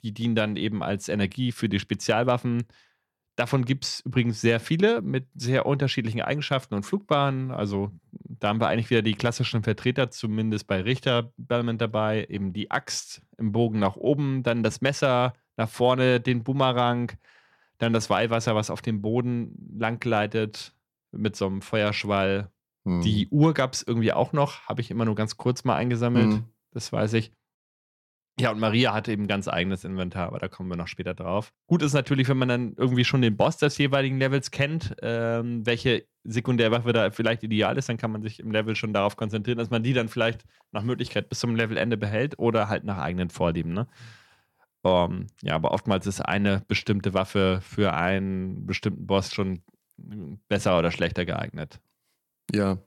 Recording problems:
none

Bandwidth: 17 kHz